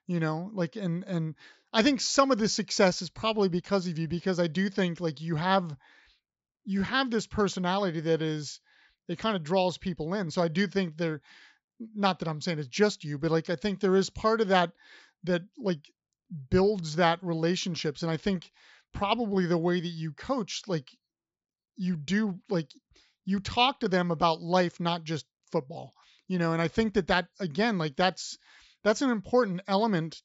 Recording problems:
high frequencies cut off; noticeable; nothing above 8 kHz

